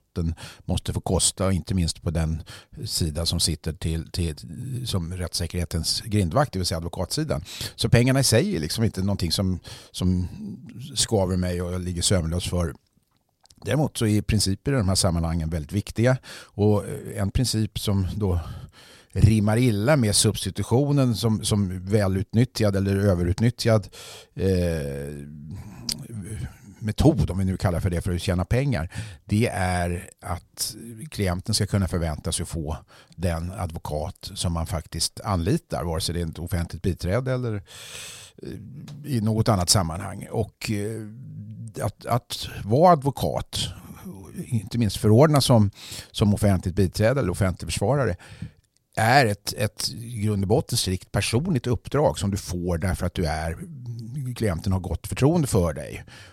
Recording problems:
none

